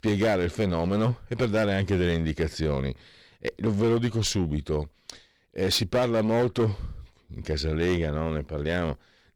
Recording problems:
distortion; slight; 10% of the sound clipped

